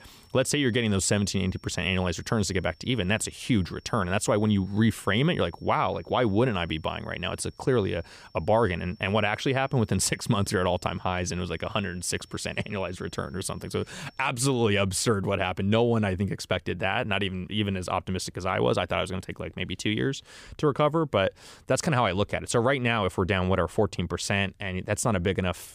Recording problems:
high-pitched whine; faint; until 14 s; 5.5 kHz, 30 dB below the speech

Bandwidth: 15 kHz